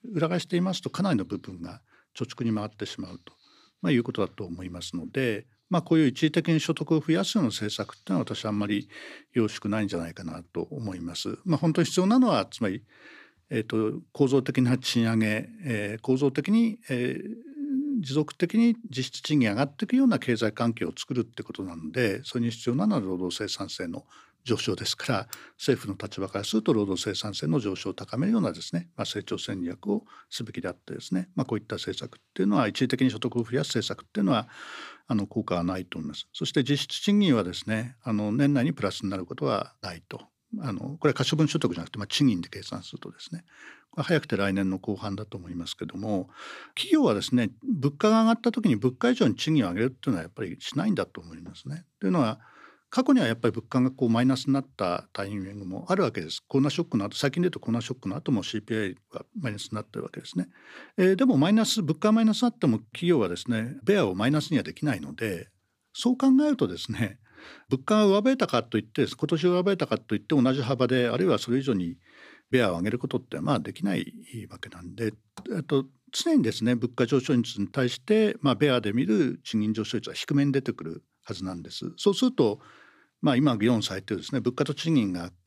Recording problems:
none

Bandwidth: 15 kHz